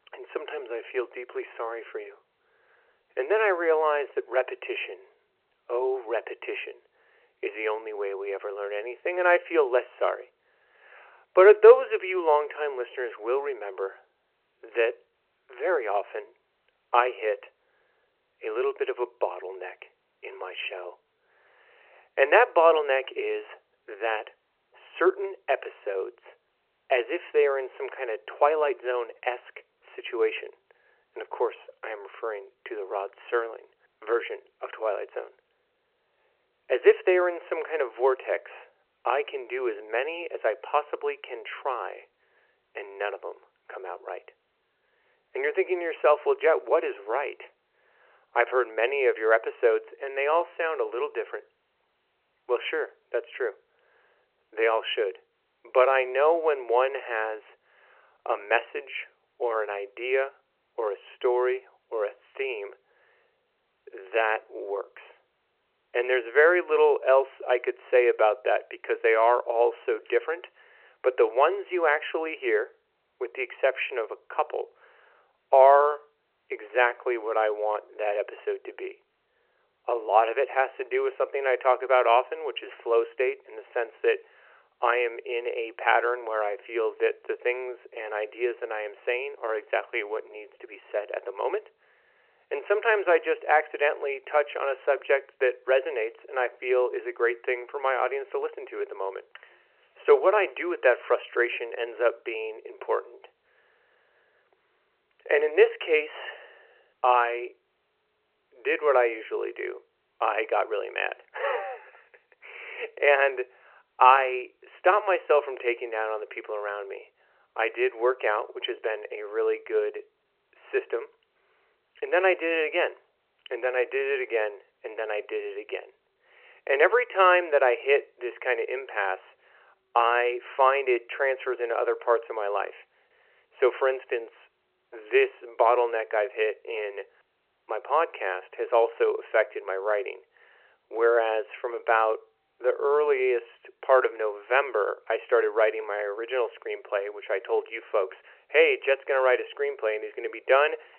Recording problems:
phone-call audio

